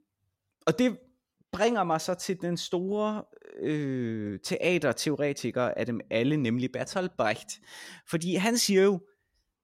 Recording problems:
none

